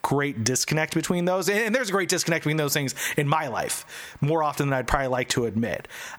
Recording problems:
squashed, flat; heavily

